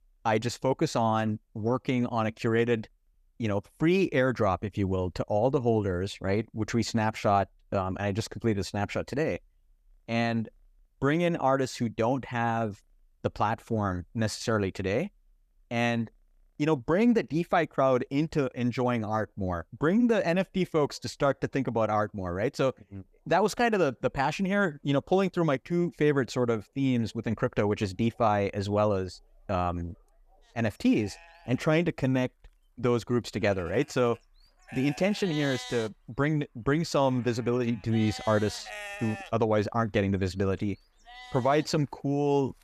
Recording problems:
animal sounds; noticeable; throughout; 15 dB below the speech

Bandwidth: 14.5 kHz